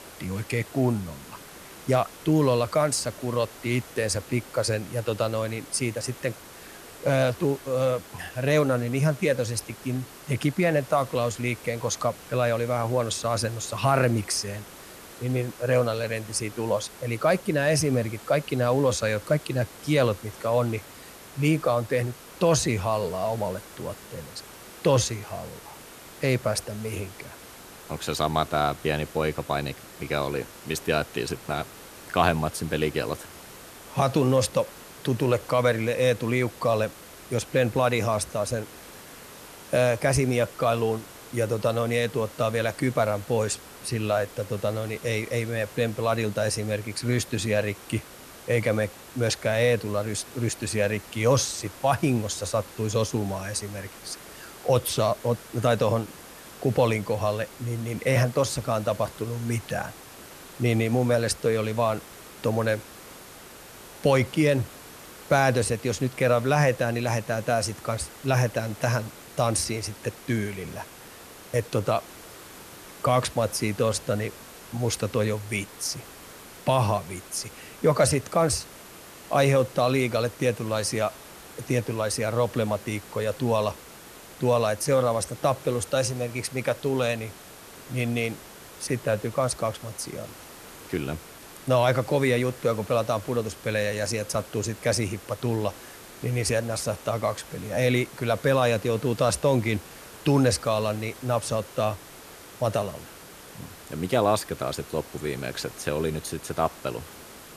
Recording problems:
hiss; noticeable; throughout; 15 dB below the speech

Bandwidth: 14 kHz